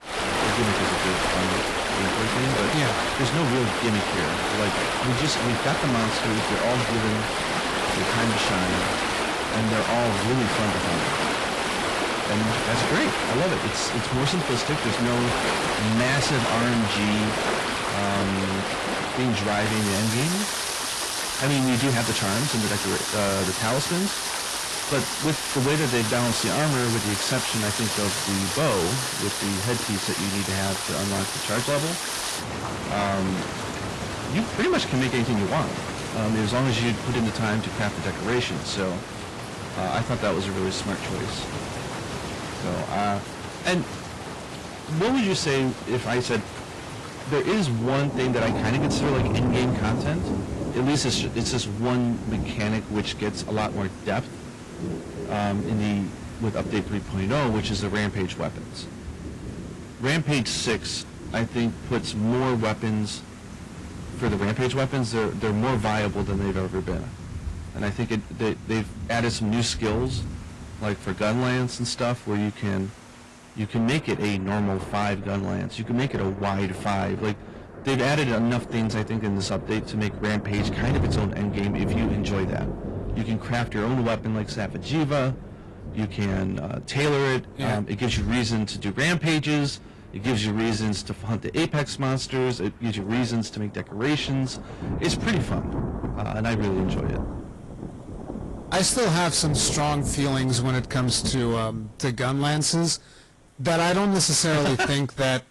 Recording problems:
distortion; heavy; 14% of the sound clipped
garbled, watery; slightly; nothing above 11 kHz
rain or running water; loud; throughout; 3 dB below the speech

